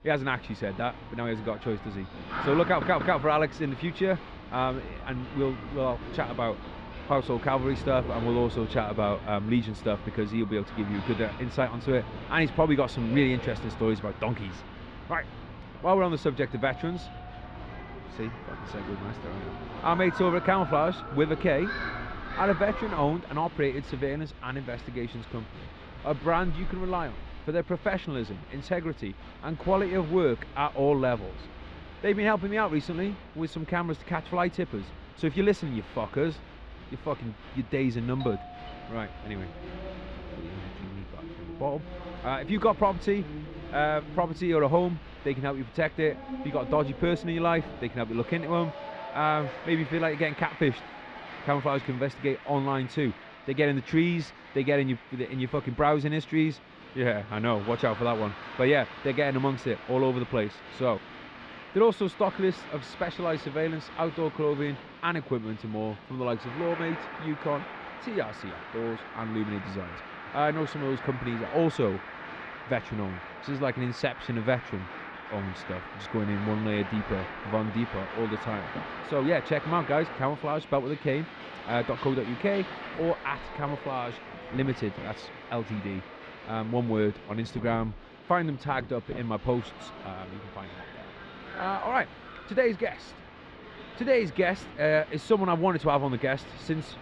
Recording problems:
muffled; slightly; fading above 3.5 kHz
crowd noise; noticeable; throughout; 10 dB below the speech
household noises; faint; throughout; 25 dB below the speech
audio stuttering; at 2.5 s
doorbell; faint; from 17 to 18 s and from 38 to 40 s; peak 15 dB below the speech

